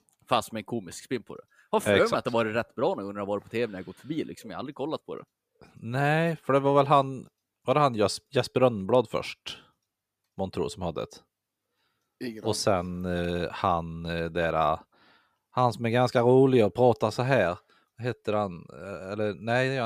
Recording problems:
abrupt cut into speech; at the end

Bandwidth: 15 kHz